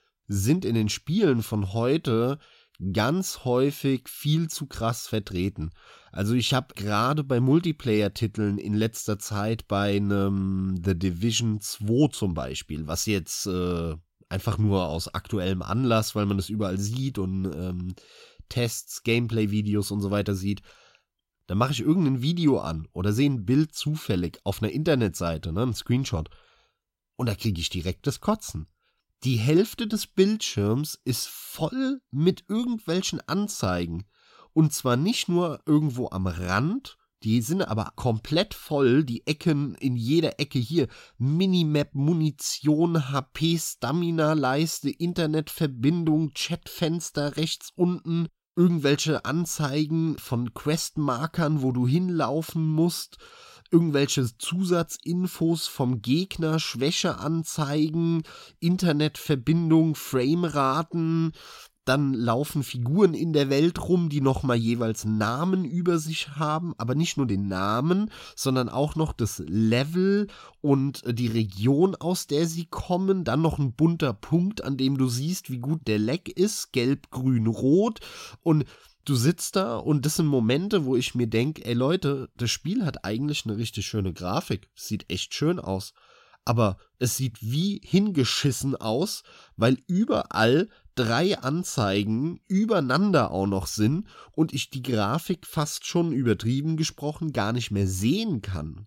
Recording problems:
none

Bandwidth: 16 kHz